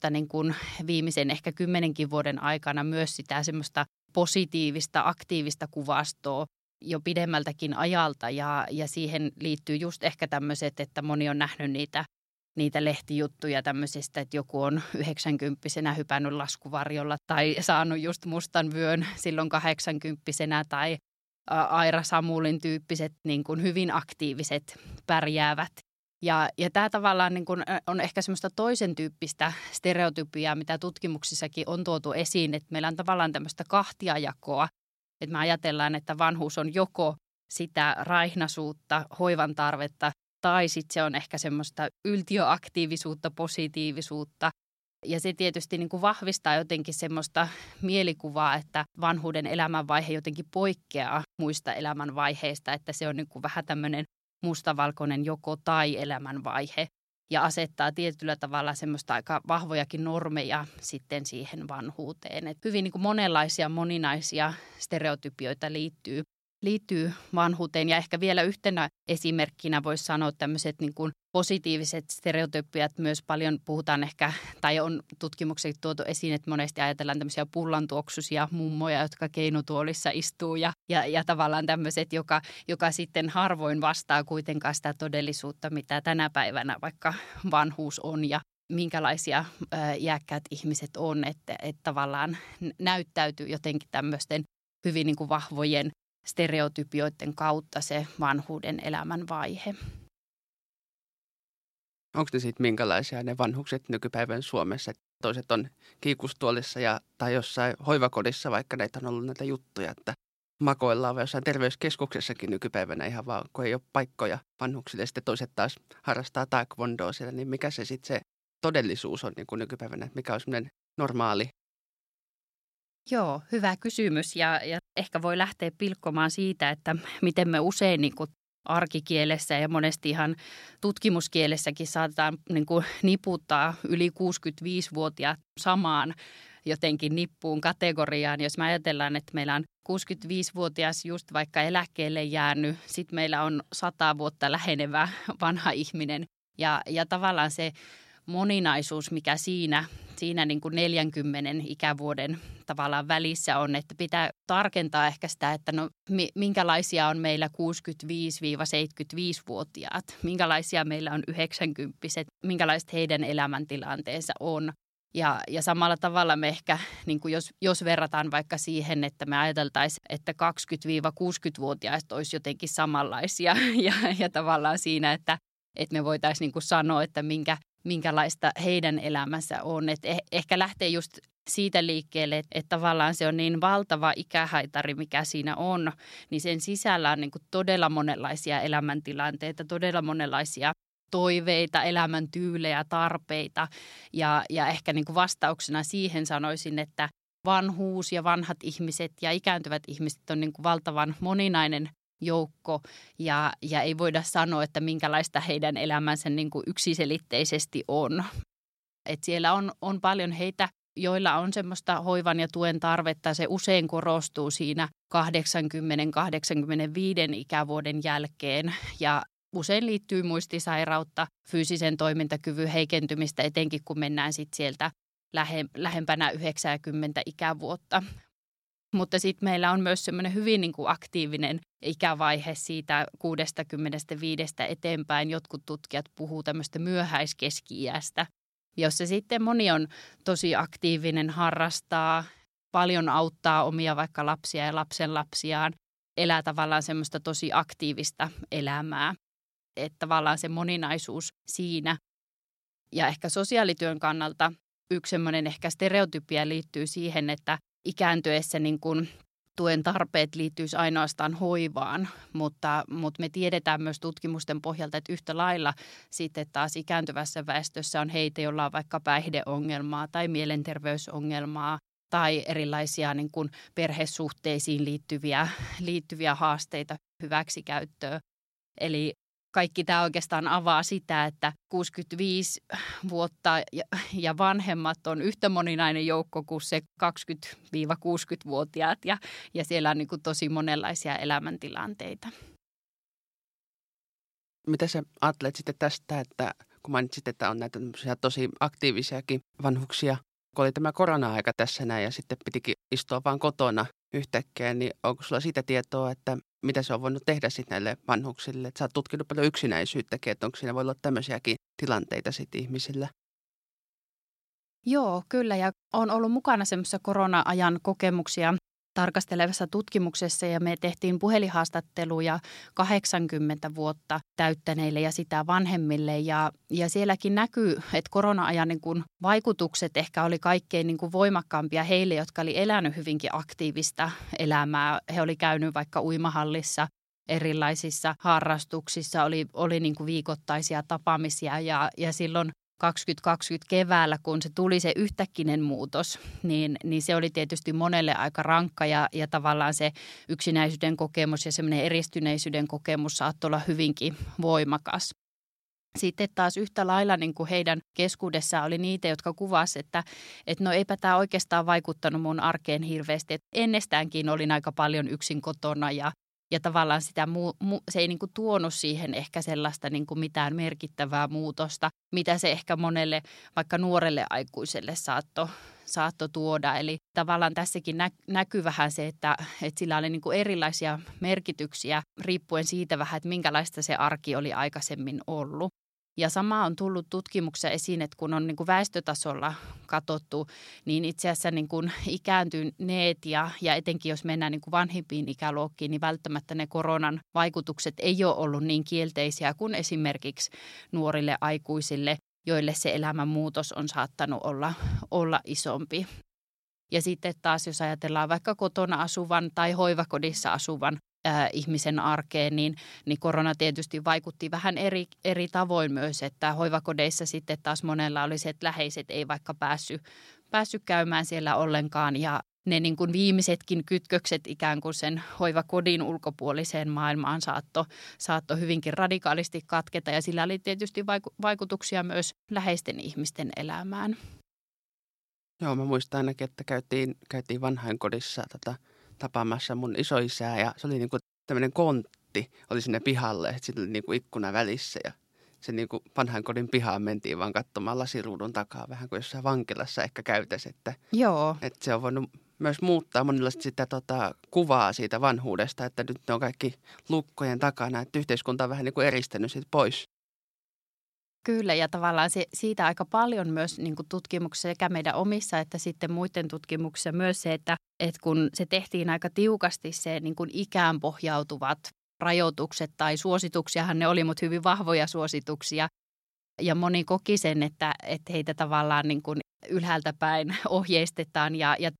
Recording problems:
none

